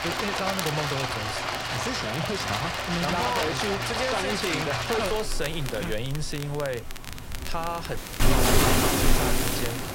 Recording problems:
rain or running water; very loud; throughout; 4 dB above the speech
crackle, like an old record; loud; 10 dB below the speech
audio cutting out; at 8 s

